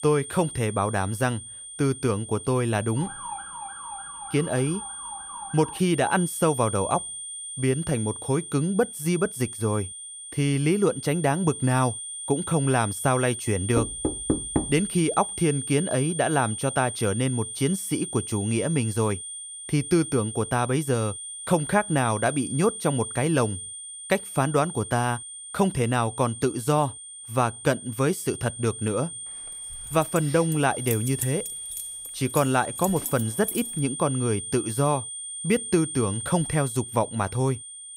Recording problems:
high-pitched whine; loud; throughout; 9 kHz, 8 dB below the speech
siren; faint; from 3 to 6 s; peak 10 dB below the speech
door banging; noticeable; at 14 s; peak 1 dB below the speech
jangling keys; noticeable; from 30 to 34 s; peak 6 dB below the speech

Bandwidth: 15.5 kHz